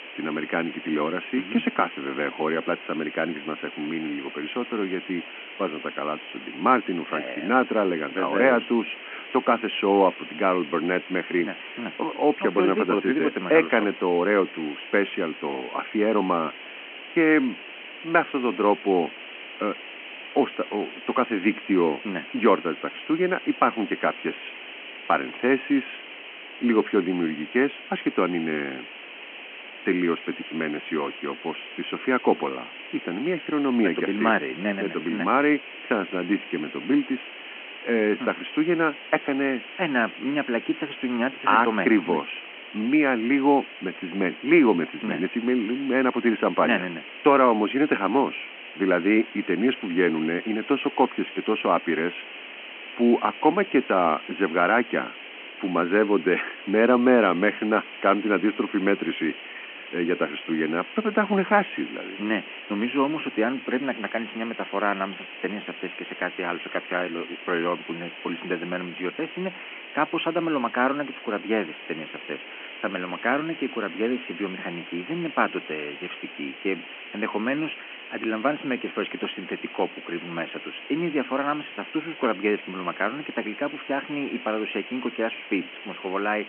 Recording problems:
phone-call audio
hiss; noticeable; throughout; 15 dB below the speech

